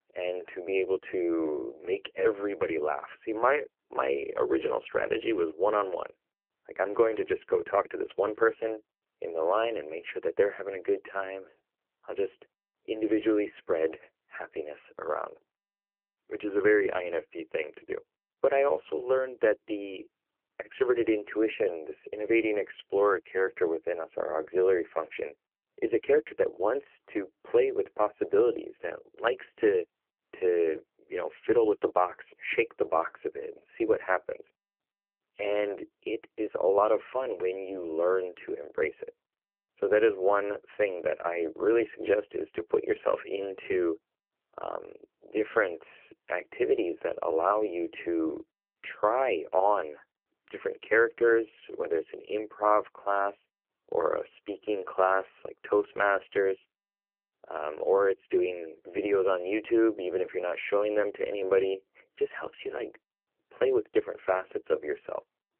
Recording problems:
phone-call audio; poor line

